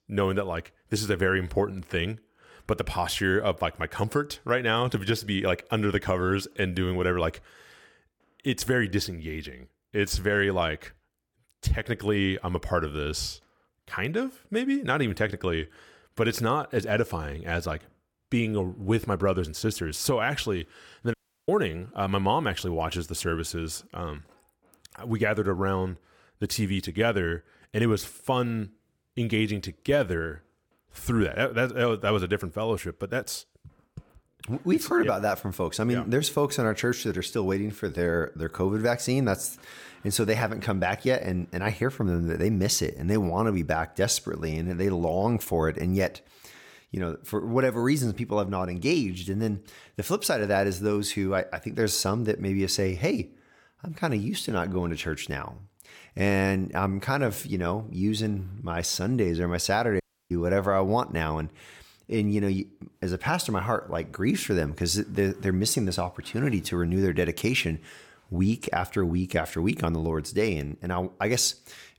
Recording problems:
audio cutting out; at 21 s and at 1:00

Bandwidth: 17.5 kHz